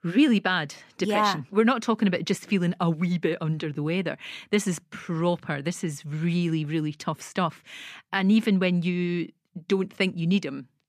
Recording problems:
none

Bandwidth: 14.5 kHz